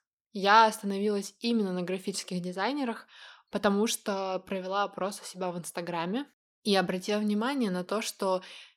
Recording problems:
none

